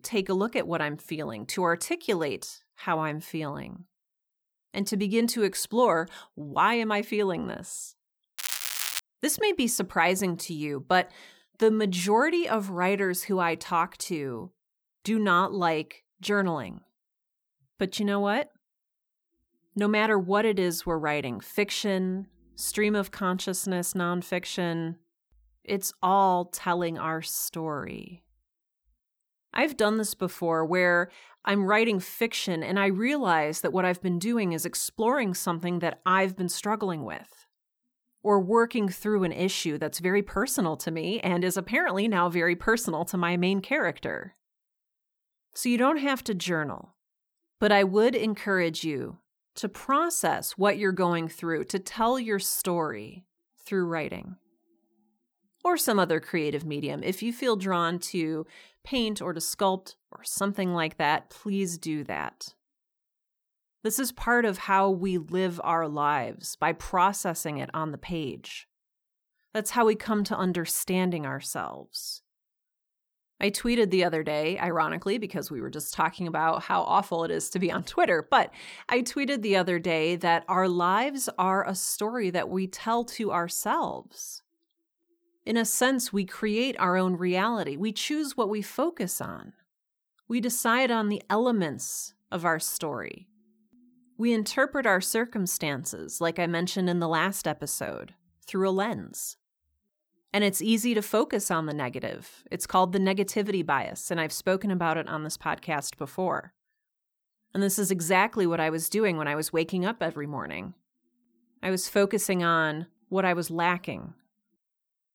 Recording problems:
crackling; loud; at 8.5 s, mostly in the pauses; 3 dB below the speech

